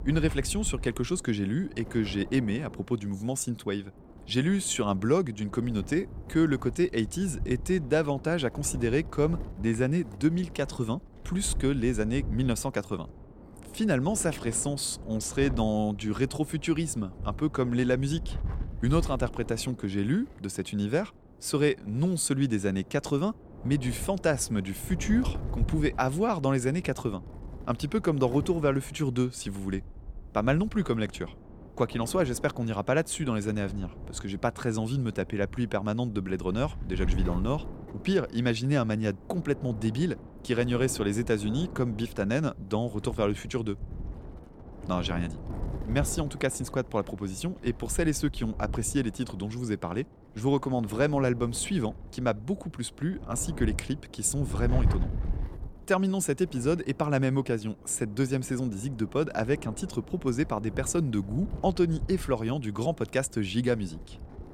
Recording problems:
wind noise on the microphone; occasional gusts; 20 dB below the speech

